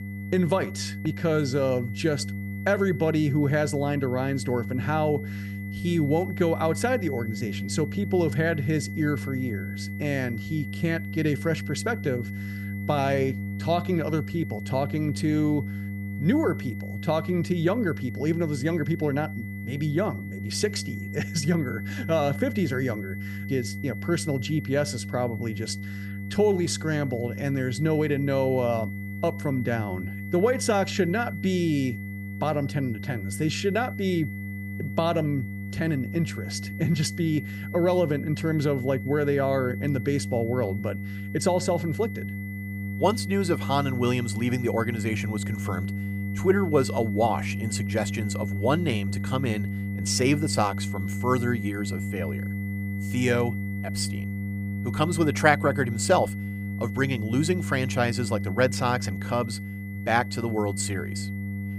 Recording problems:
electrical hum; noticeable; throughout; 50 Hz, 15 dB below the speech
high-pitched whine; noticeable; throughout; 2 kHz, 15 dB below the speech

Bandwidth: 15 kHz